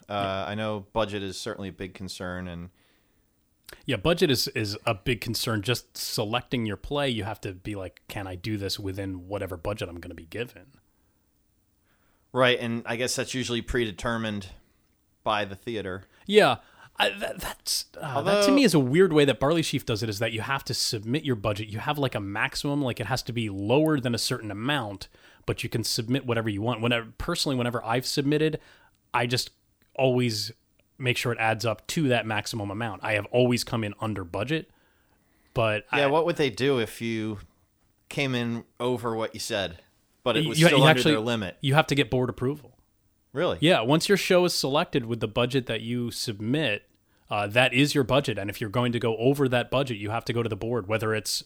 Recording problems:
none

